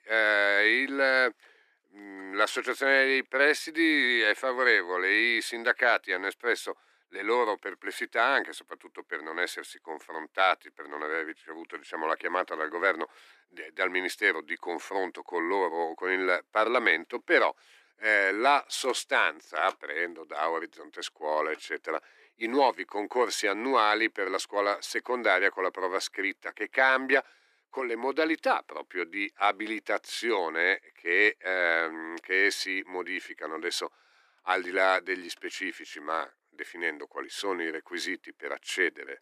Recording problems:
thin; somewhat; fading below 300 Hz

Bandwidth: 14 kHz